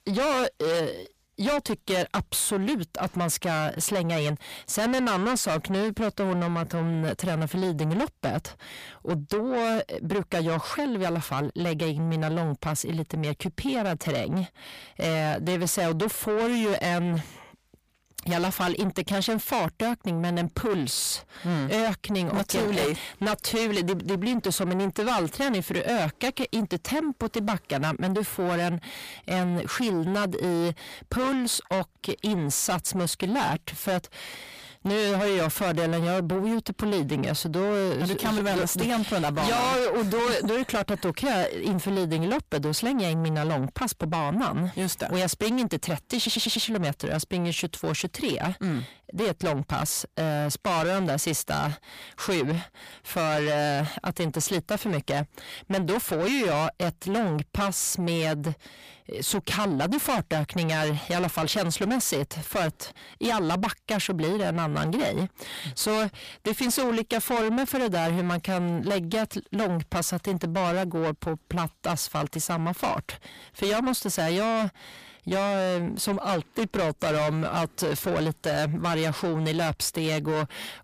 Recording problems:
distortion; heavy; 6 dB below the speech
audio stuttering; at 46 s

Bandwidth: 15 kHz